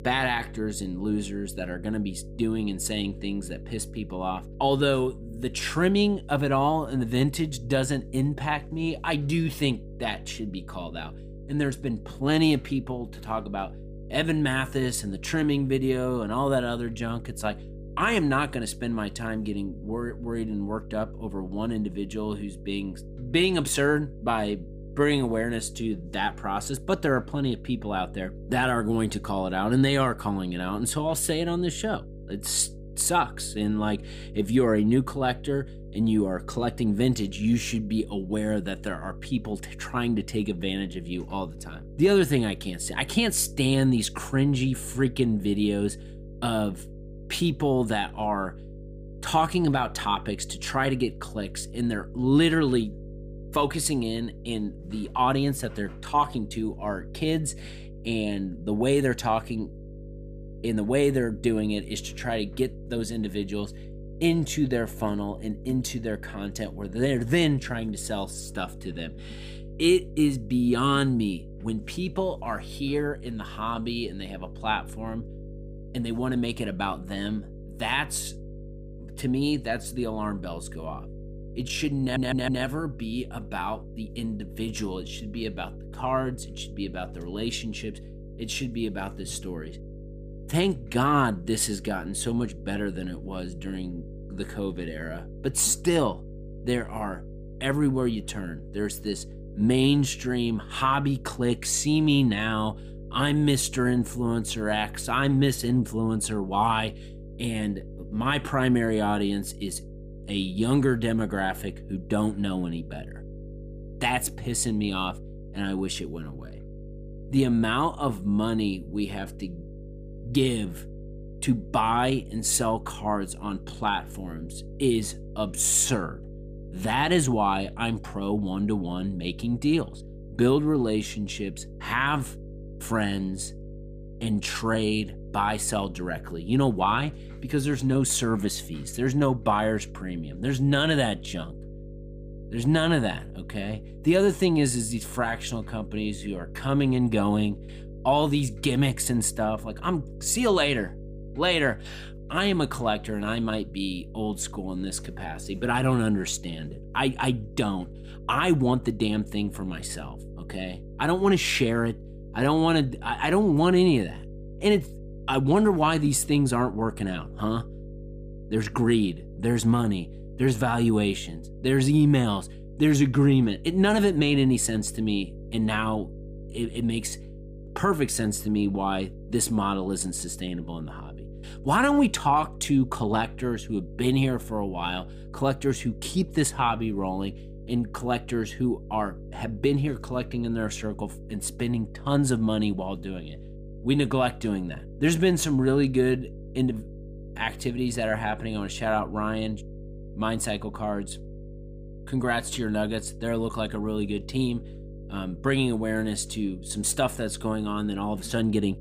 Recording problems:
electrical hum; faint; throughout; 50 Hz, 20 dB below the speech
audio stuttering; at 1:22

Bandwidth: 15 kHz